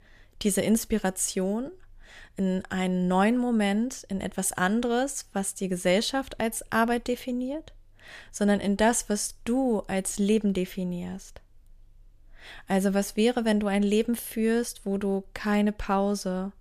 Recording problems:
none

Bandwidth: 14.5 kHz